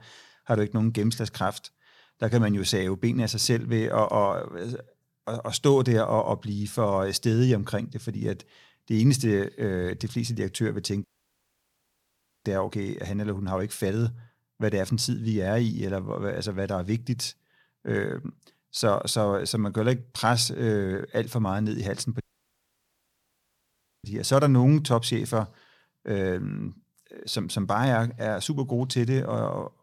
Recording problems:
audio cutting out; at 11 s for 1.5 s and at 22 s for 2 s

